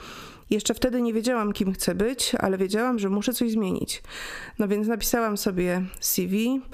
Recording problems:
squashed, flat; somewhat

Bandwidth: 14.5 kHz